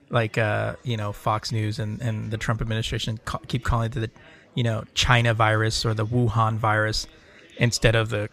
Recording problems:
chatter from many people; faint; throughout; 30 dB below the speech

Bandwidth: 14.5 kHz